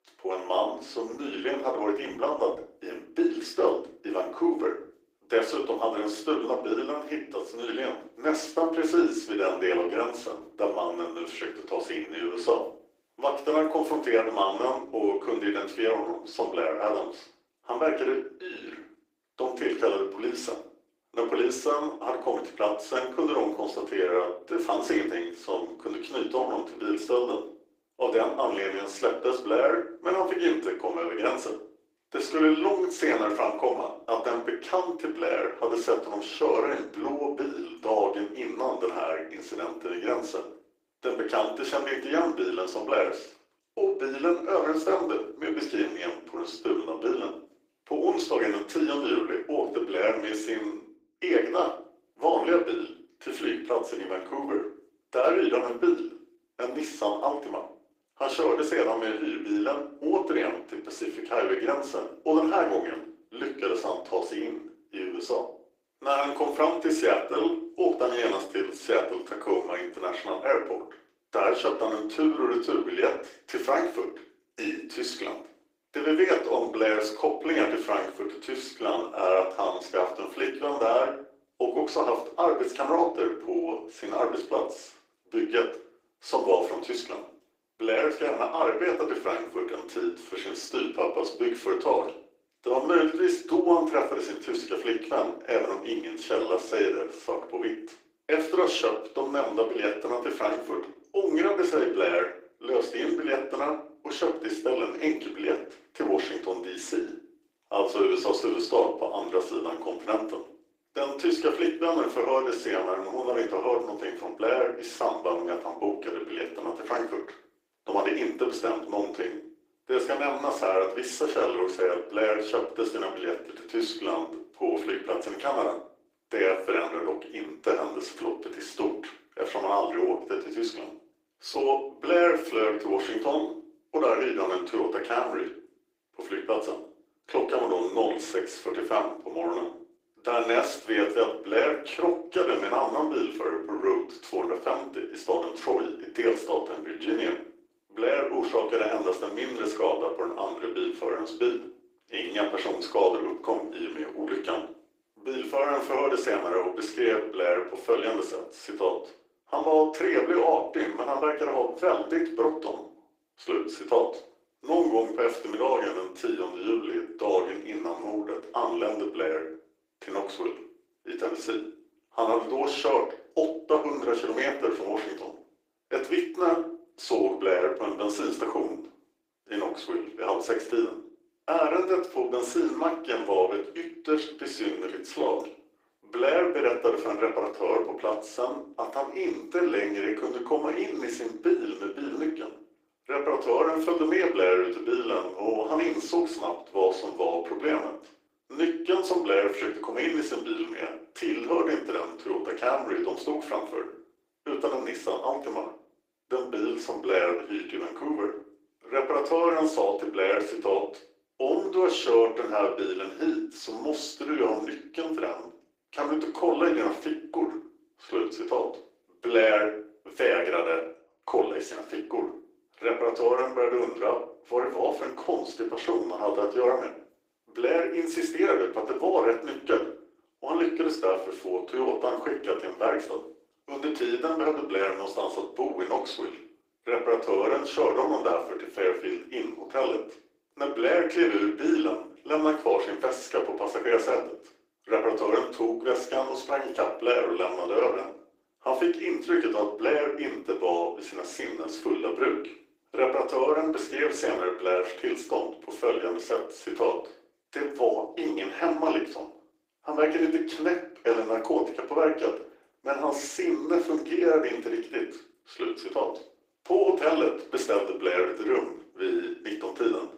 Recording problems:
off-mic speech; far
thin; very; fading below 300 Hz
room echo; slight; dies away in 0.4 s
garbled, watery; slightly; nothing above 15.5 kHz

